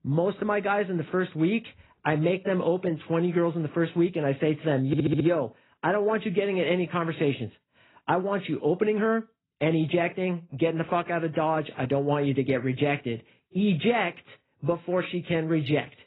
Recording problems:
garbled, watery; badly; nothing above 4 kHz
audio stuttering; at 5 s

